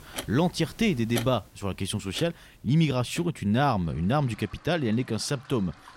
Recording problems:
household noises; noticeable; throughout; 15 dB below the speech

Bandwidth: 16 kHz